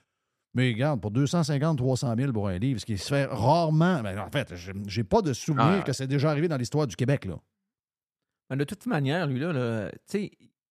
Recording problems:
none

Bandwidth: 14.5 kHz